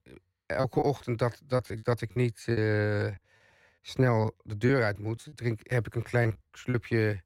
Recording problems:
muffled; slightly; fading above 3 kHz
choppy; very; 10% of the speech affected

